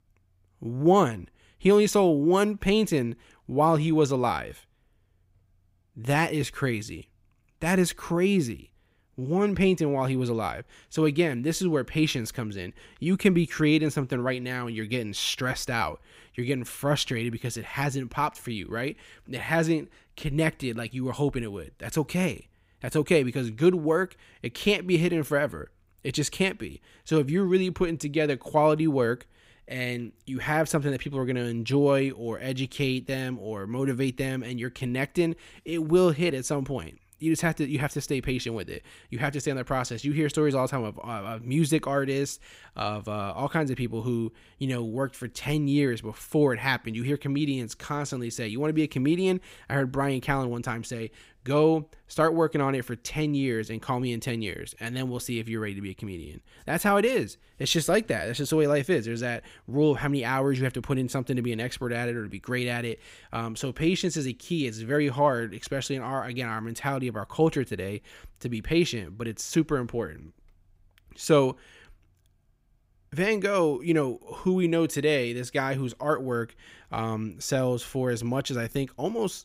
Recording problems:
none

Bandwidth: 15.5 kHz